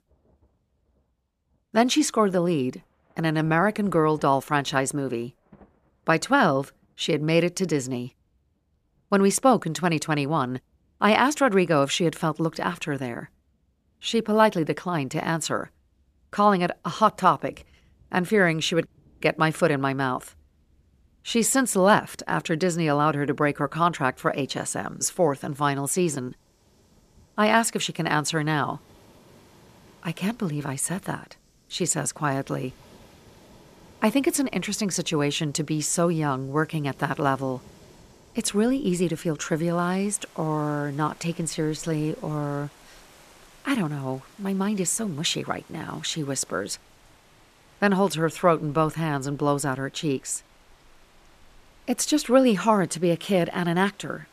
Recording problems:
rain or running water; faint; throughout; 30 dB below the speech

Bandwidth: 14.5 kHz